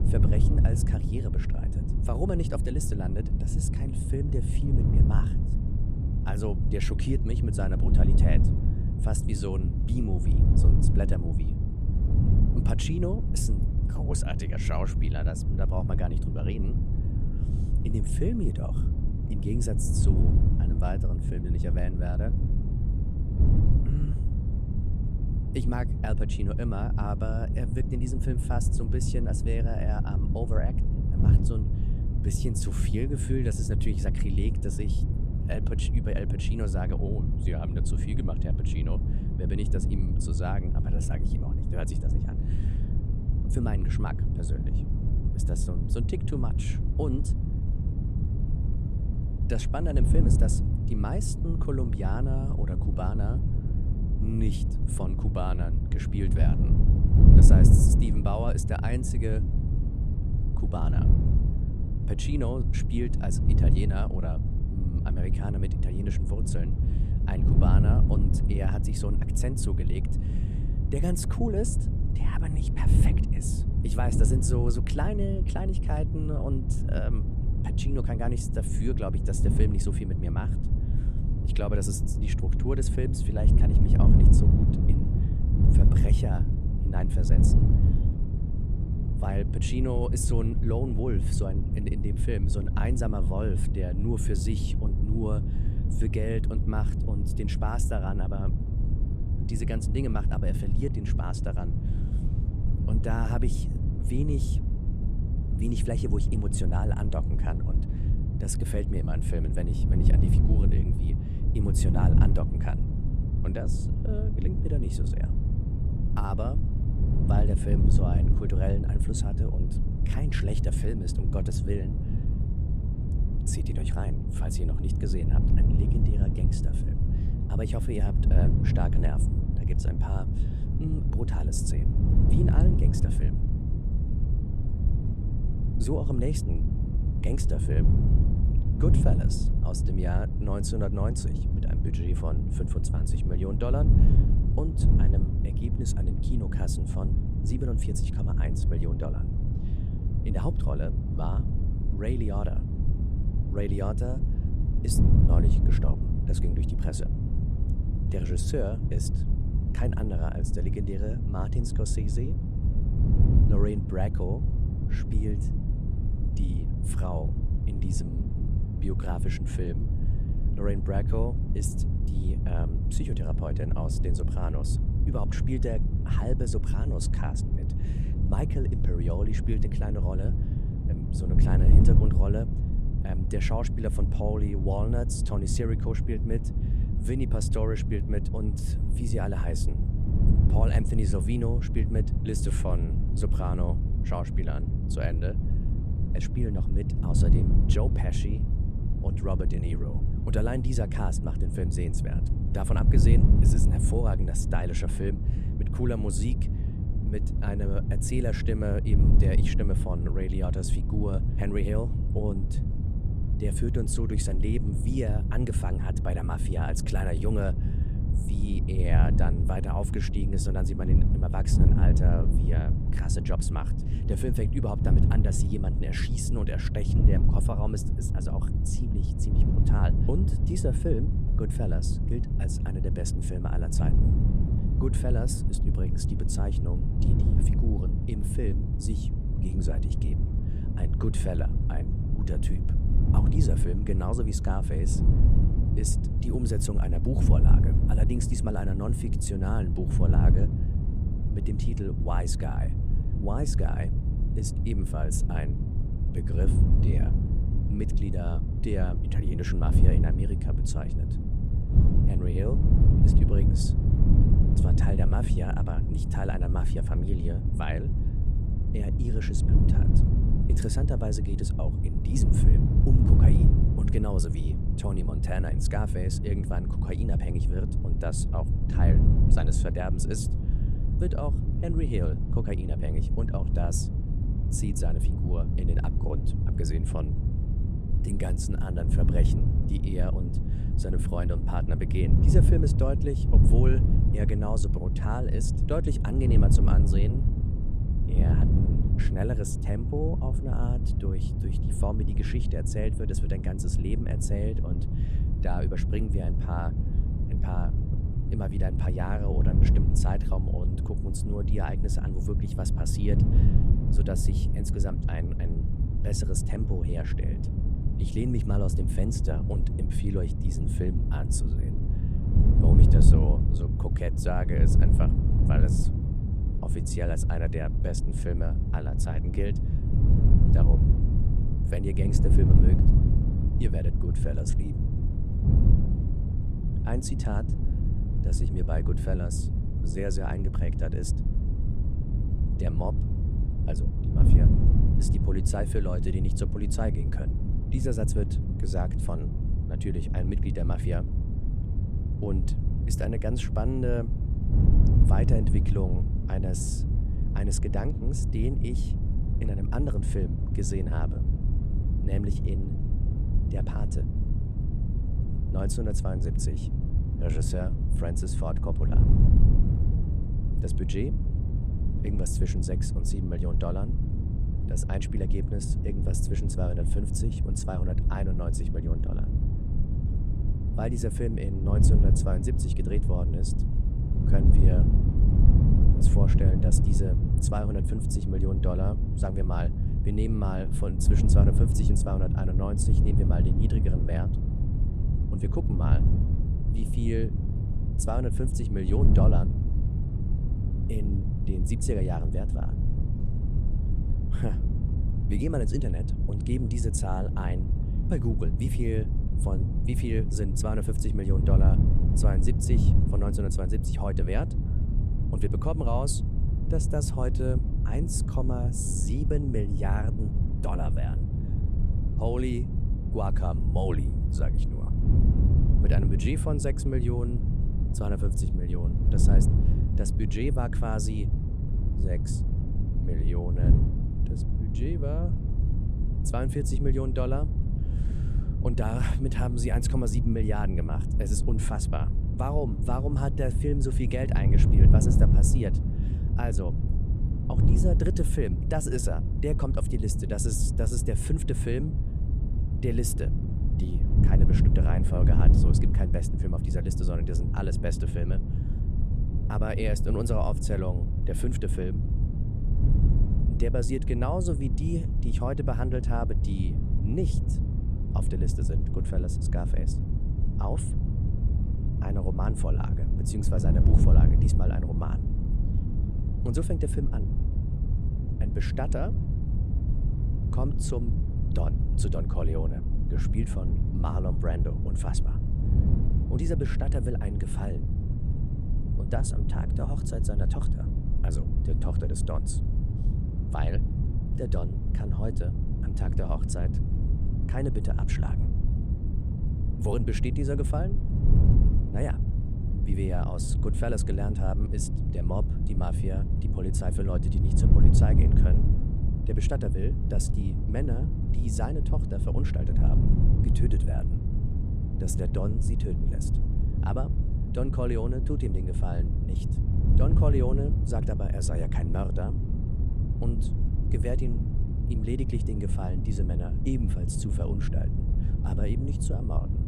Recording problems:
wind noise on the microphone; heavy; 3 dB below the speech

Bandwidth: 14.5 kHz